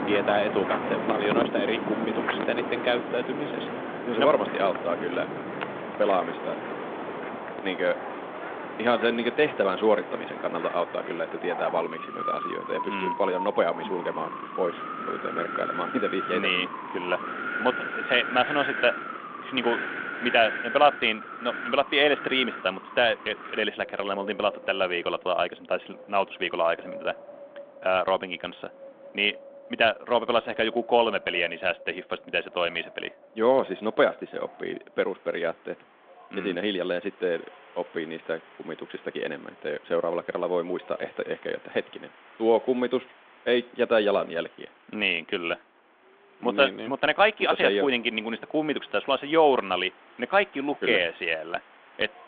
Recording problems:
phone-call audio; nothing above 3.5 kHz
wind in the background; loud; throughout; 7 dB below the speech

